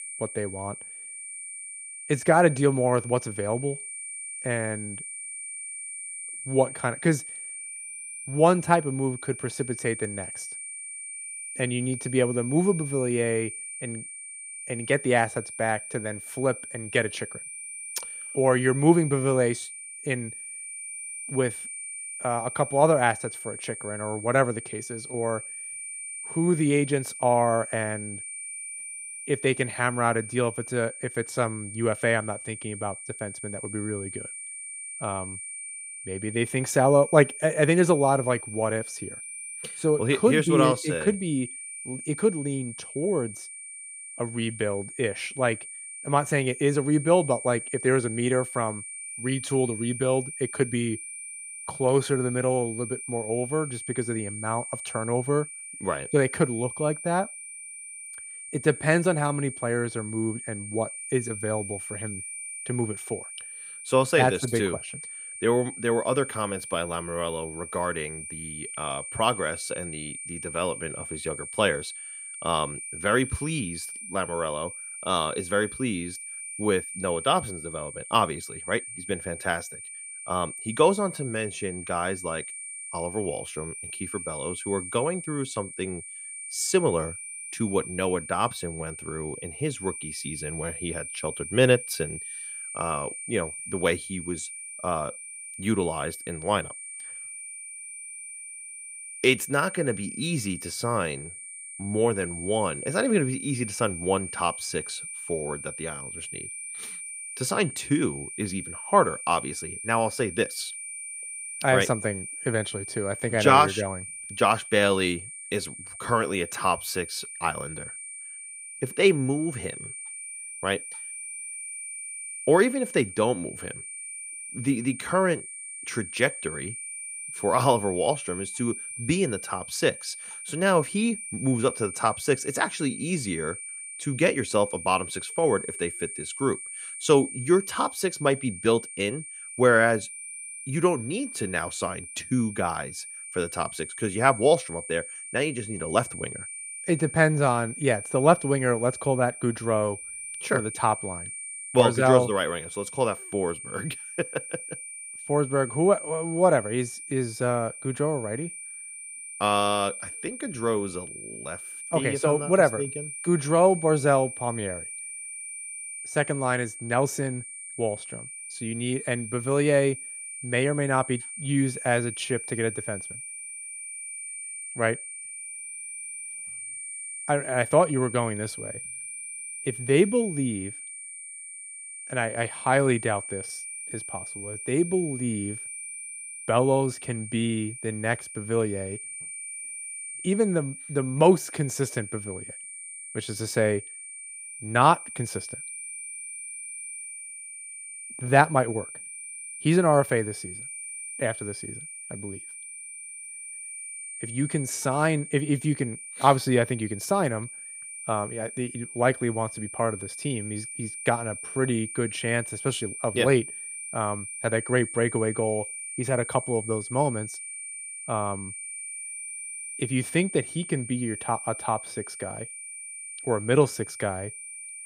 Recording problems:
high-pitched whine; loud; throughout; 9 kHz, 9 dB below the speech

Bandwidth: 15.5 kHz